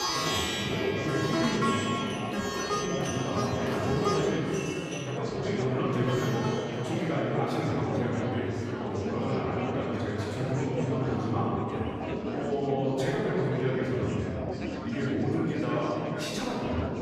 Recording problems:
room echo; strong; dies away in 2.4 s
off-mic speech; far
background music; loud; throughout; 2 dB below the speech
chatter from many people; loud; throughout; 5 dB below the speech
clattering dishes; noticeable; until 5 s; peak 8 dB below the speech

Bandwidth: 14.5 kHz